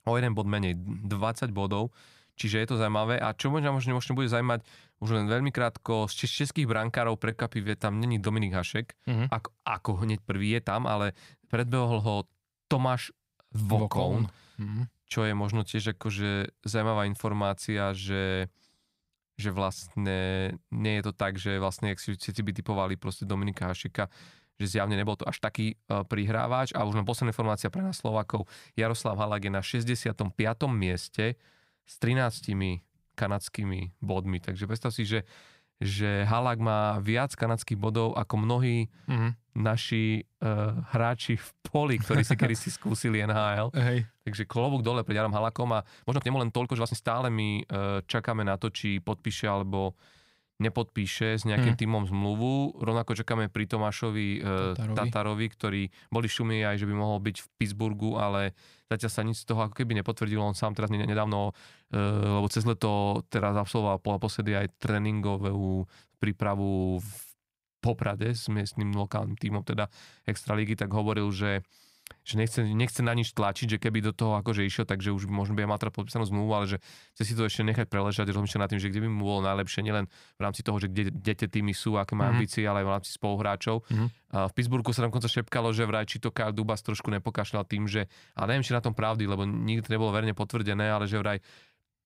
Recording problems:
uneven, jittery; strongly; from 4.5 s to 1:21

